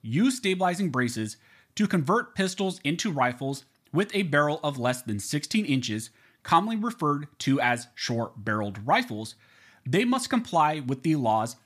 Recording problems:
none

